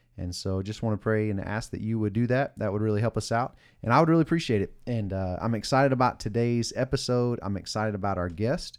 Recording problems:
none

